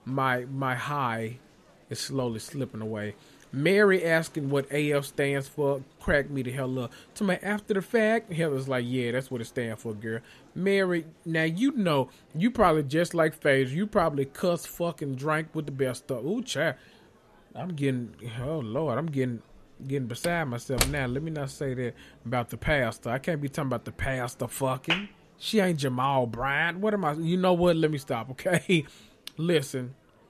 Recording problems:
murmuring crowd; faint; throughout; 30 dB below the speech
door banging; noticeable; at 20 s; peak level with the speech

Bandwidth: 13.5 kHz